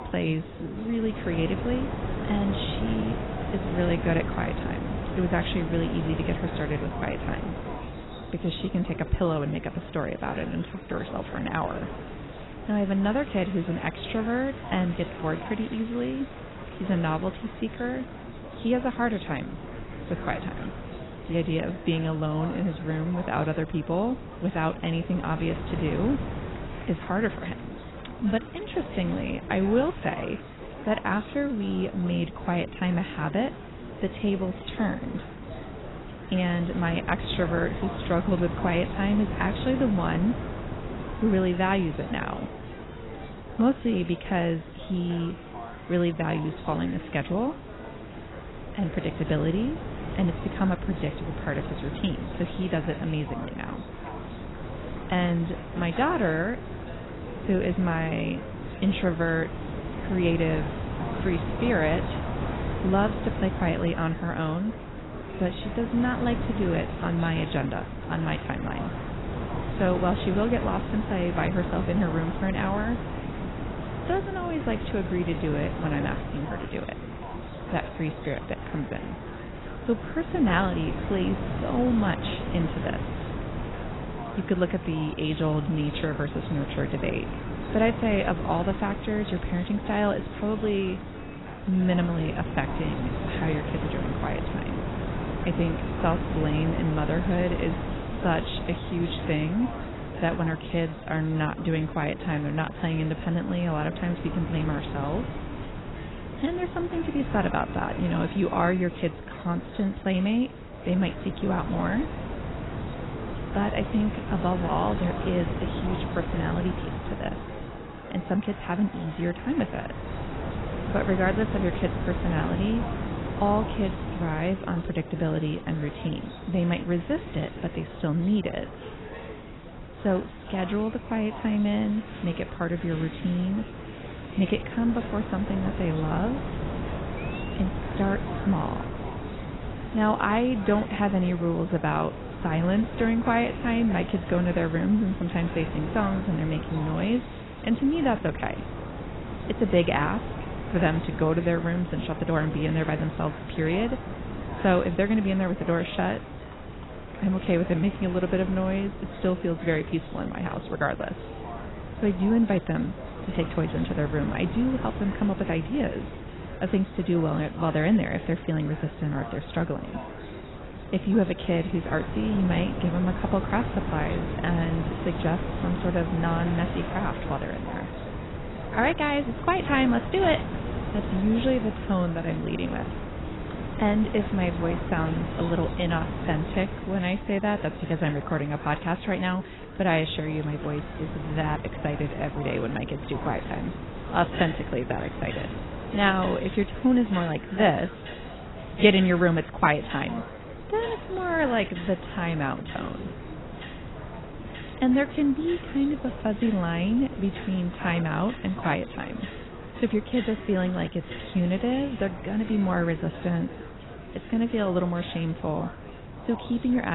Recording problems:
garbled, watery; badly; nothing above 4 kHz
chatter from many people; noticeable; throughout; 15 dB below the speech
wind noise on the microphone; occasional gusts; 10 dB below the speech
traffic noise; faint; throughout; 20 dB below the speech
abrupt cut into speech; at the end

